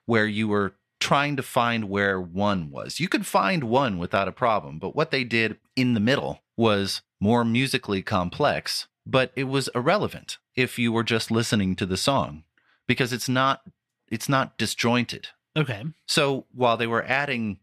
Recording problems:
none

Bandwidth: 14 kHz